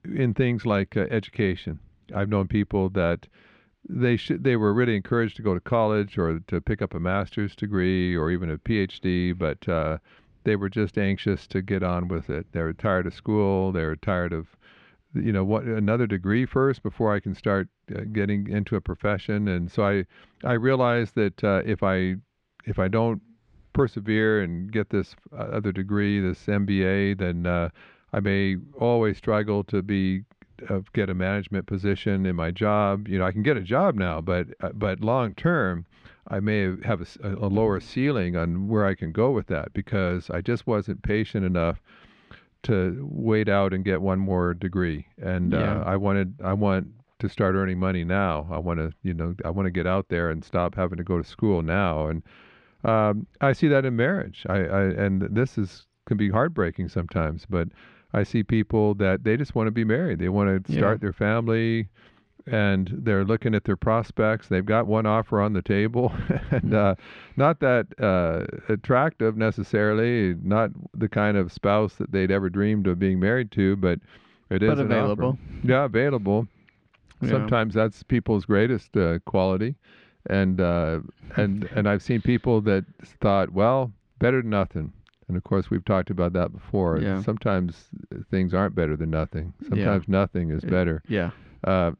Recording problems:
muffled; slightly; fading above 2.5 kHz

